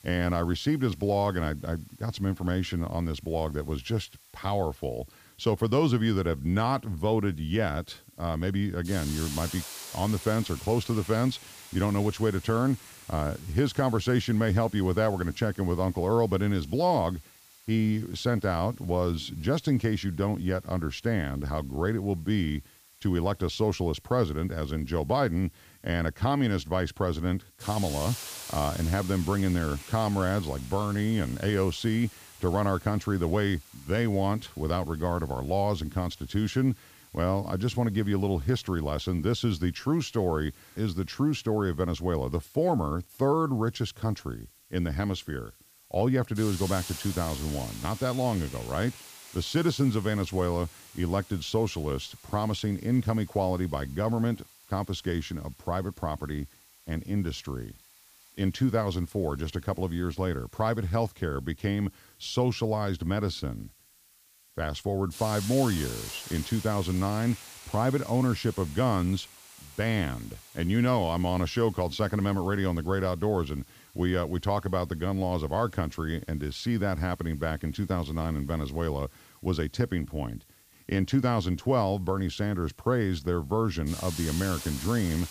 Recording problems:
hiss; noticeable; throughout; 15 dB below the speech

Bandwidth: 15 kHz